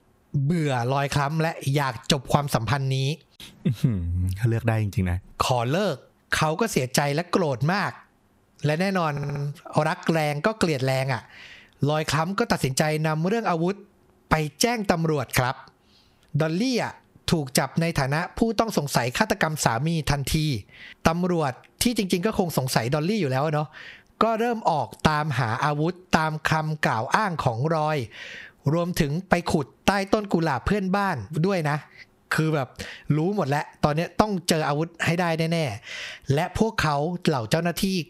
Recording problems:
squashed, flat; somewhat
audio stuttering; at 9 s

